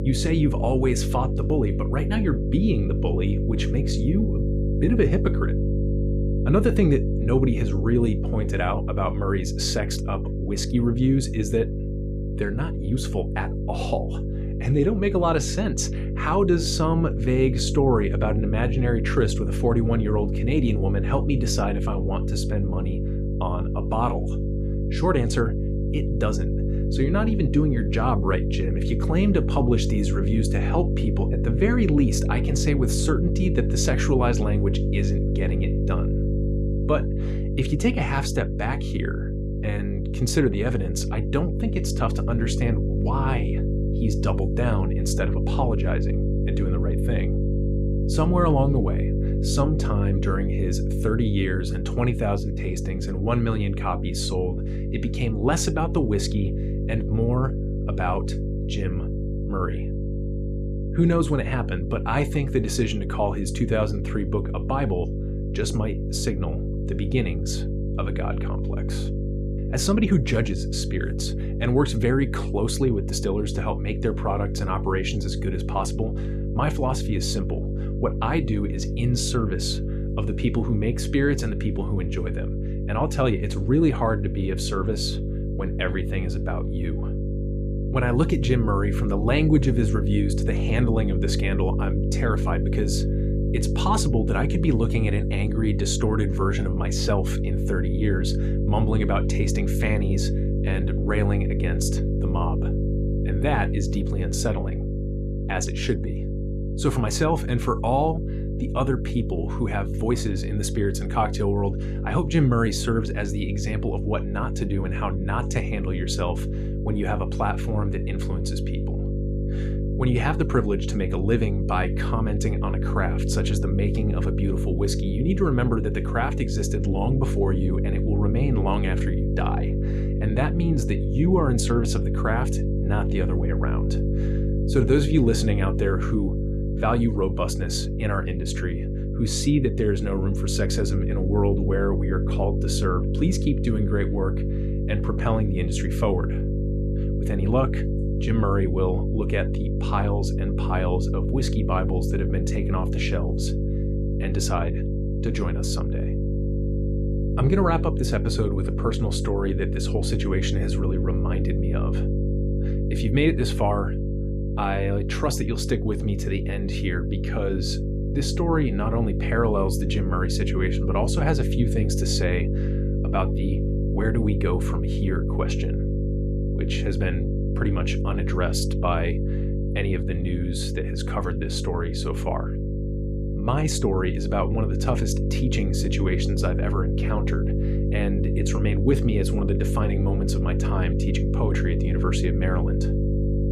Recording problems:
electrical hum; loud; throughout; 50 Hz, 6 dB below the speech

